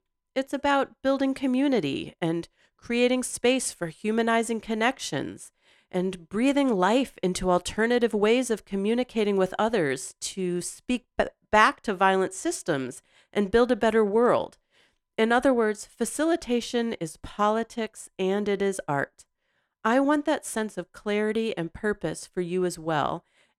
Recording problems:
none

